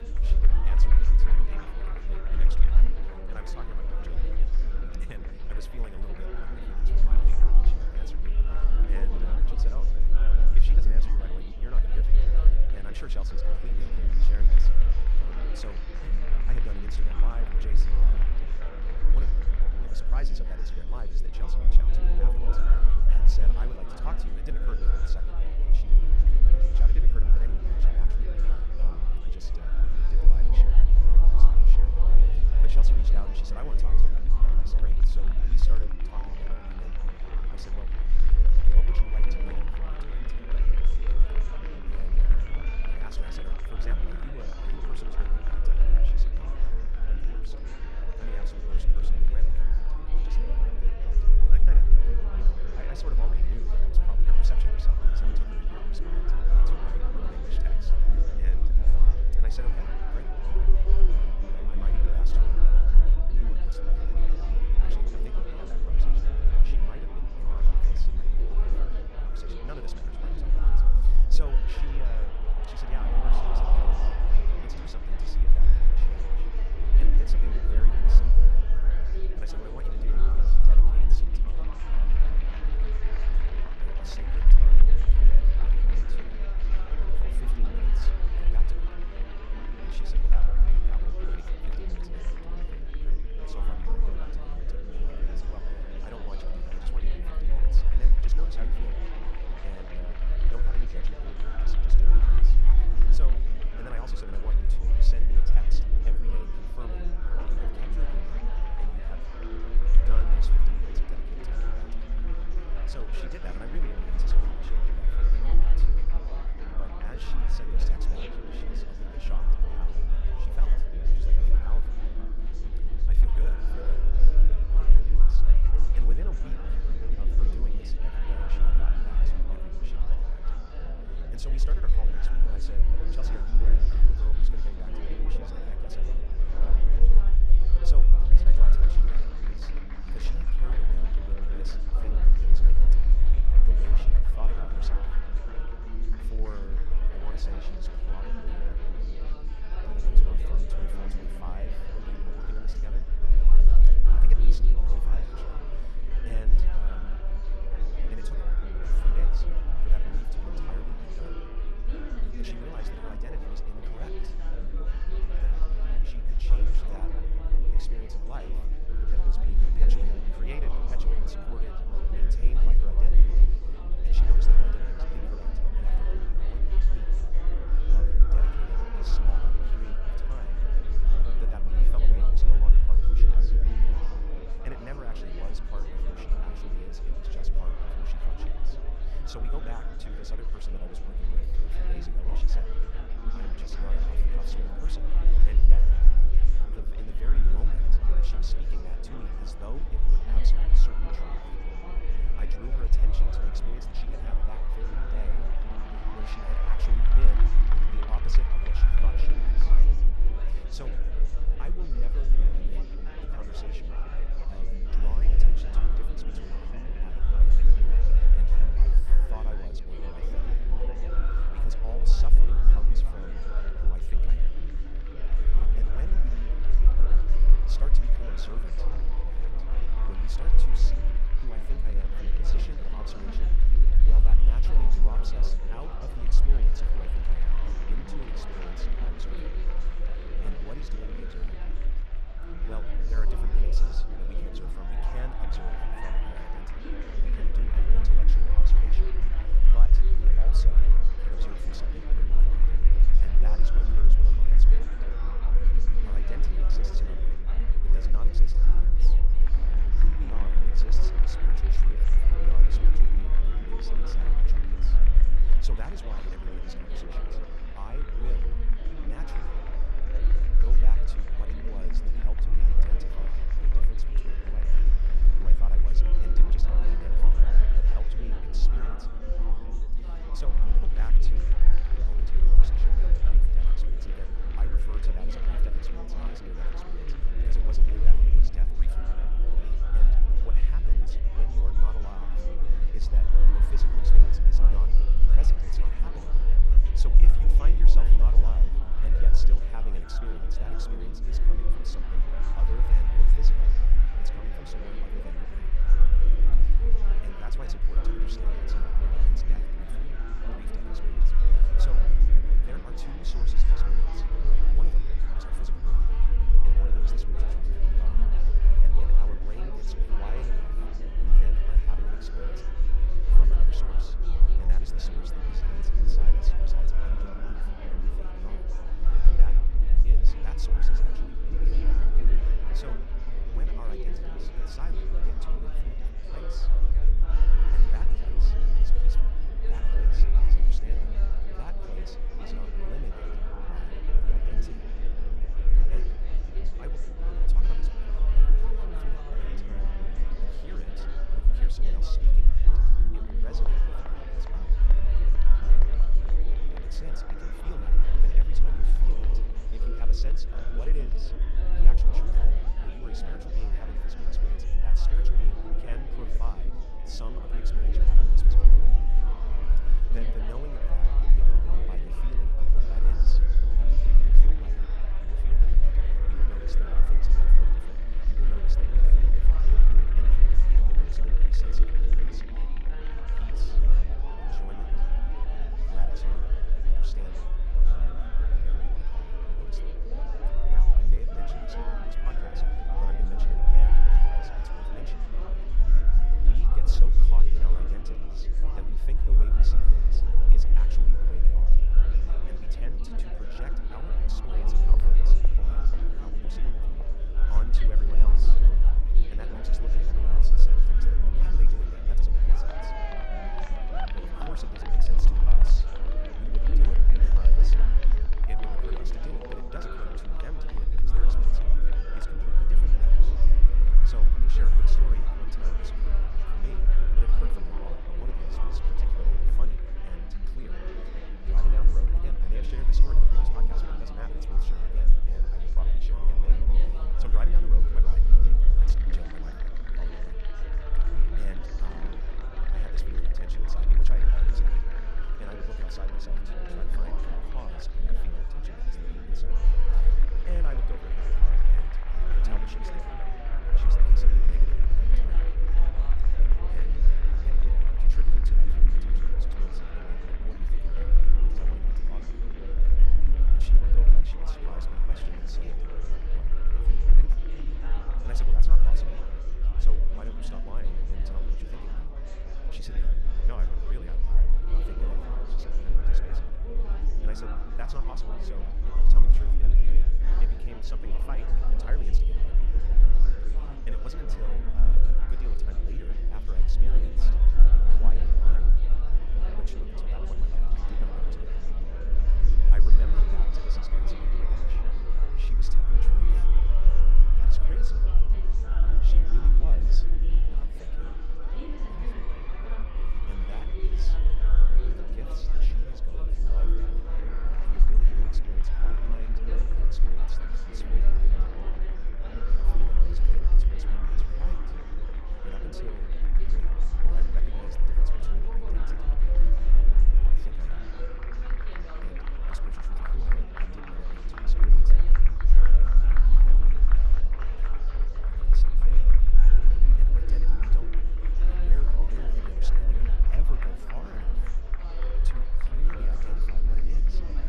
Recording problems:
wrong speed, natural pitch; too fast; 1.5 times normal speed
murmuring crowd; very loud; throughout; 3 dB above the speech
low rumble; loud; throughout; 5 dB below the speech
electrical hum; faint; throughout; 50 Hz, 20 dB below the speech

